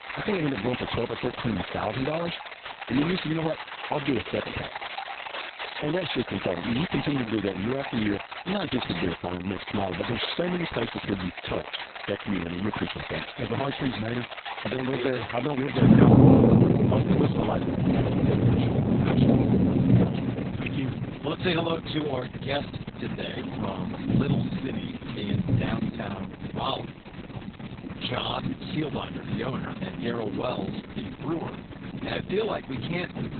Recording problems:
garbled, watery; badly; nothing above 4 kHz
rain or running water; very loud; throughout; 3 dB above the speech

